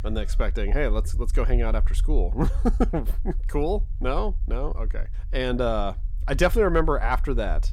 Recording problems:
low rumble; faint; throughout; 25 dB below the speech

